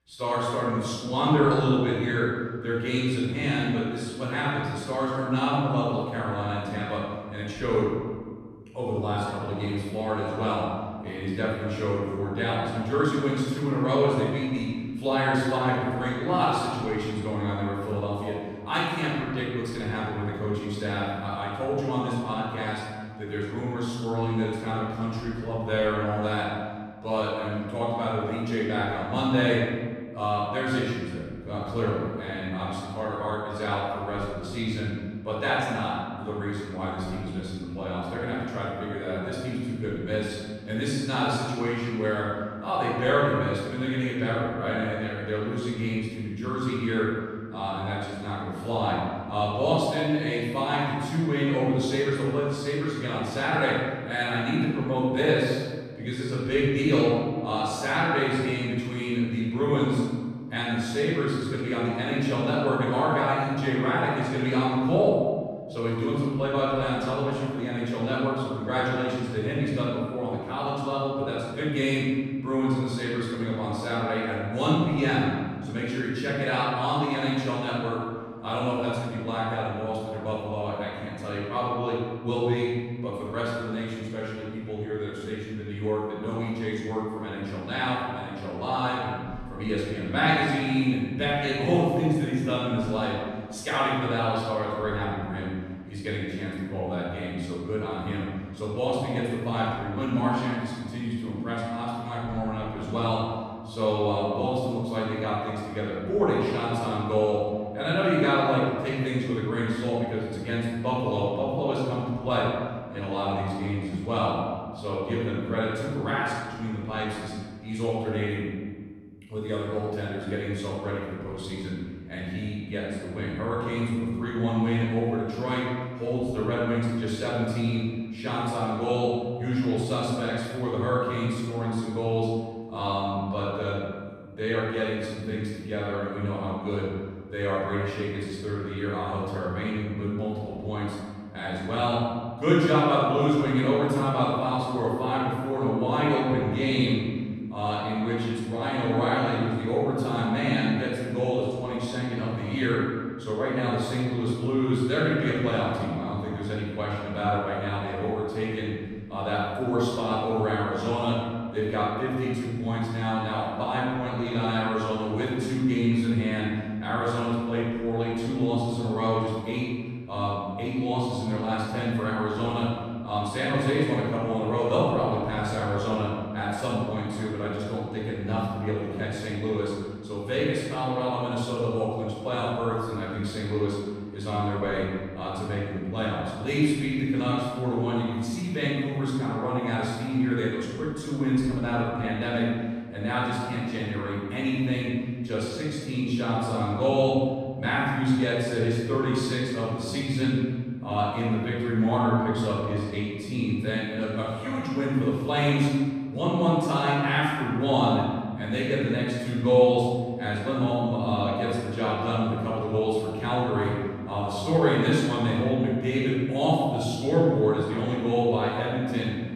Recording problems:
room echo; strong; dies away in 1.7 s
off-mic speech; far

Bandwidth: 13.5 kHz